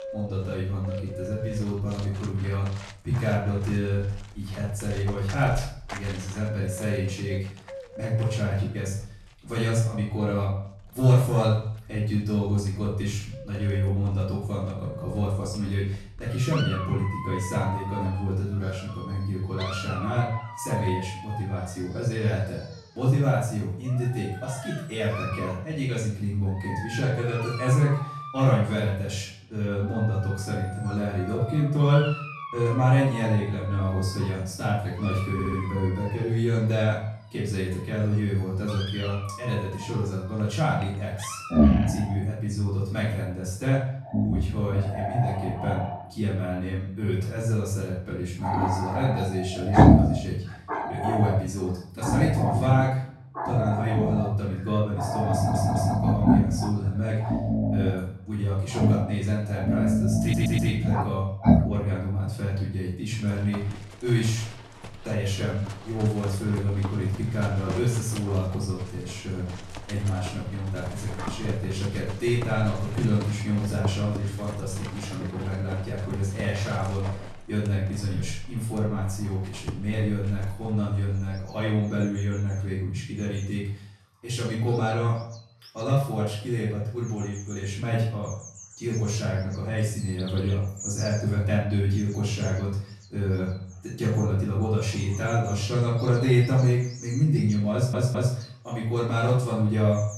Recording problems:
off-mic speech; far
room echo; noticeable; dies away in 0.5 s
animal sounds; loud; throughout; 2 dB below the speech
audio stuttering; 4 times, first at 35 s

